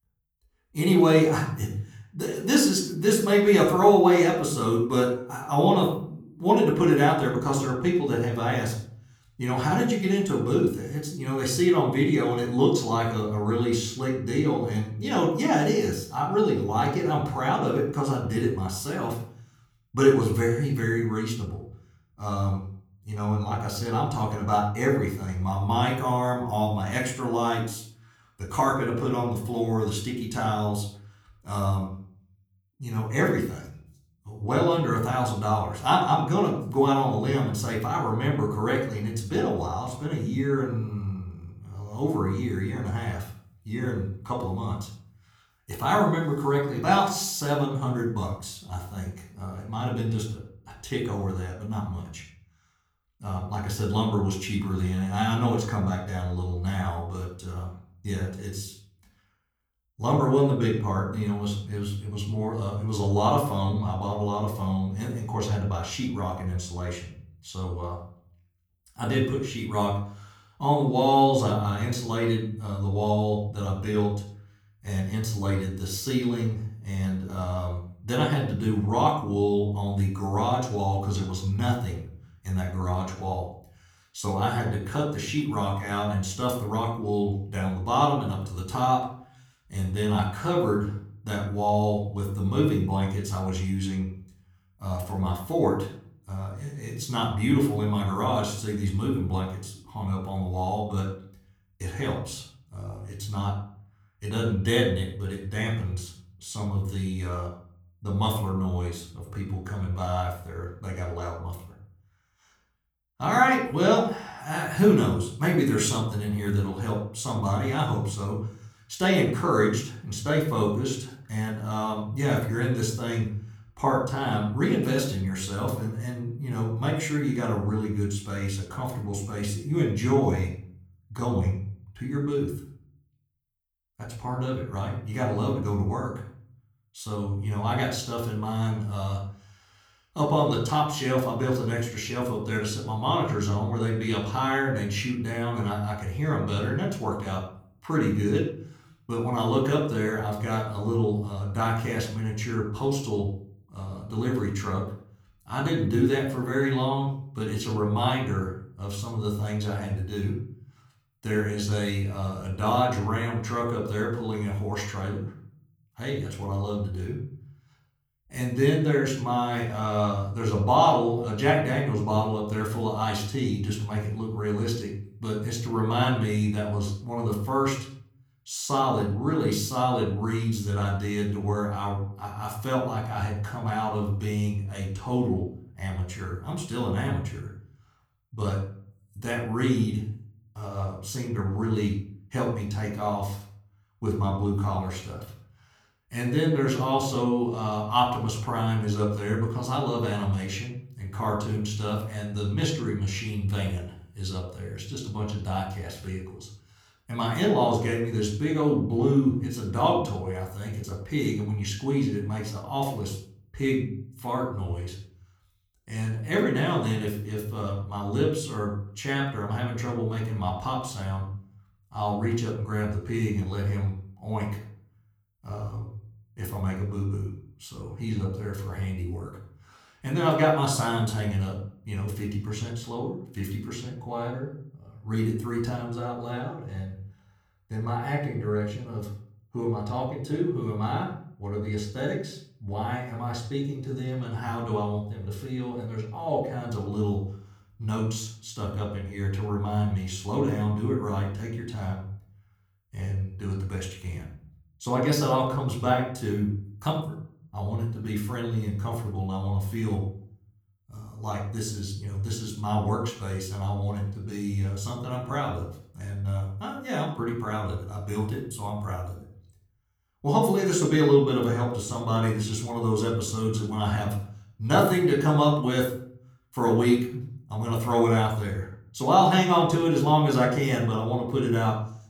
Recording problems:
room echo; slight; dies away in 0.6 s
off-mic speech; somewhat distant

